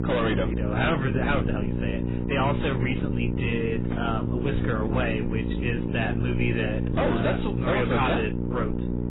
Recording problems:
distortion; heavy; 6 dB below the speech
garbled, watery; badly; nothing above 4 kHz
electrical hum; loud; throughout; 60 Hz, 6 dB below the speech
uneven, jittery; strongly; from 1 to 7 s

